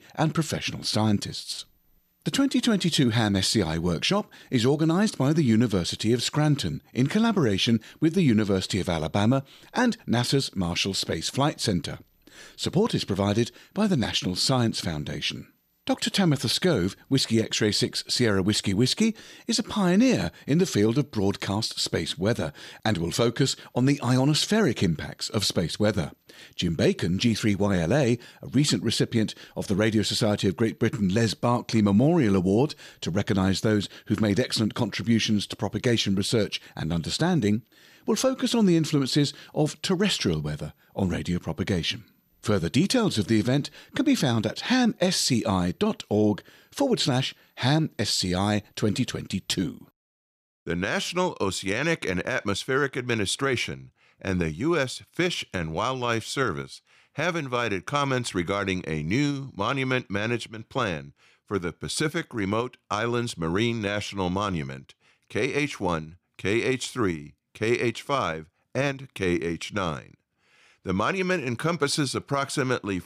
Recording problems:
none

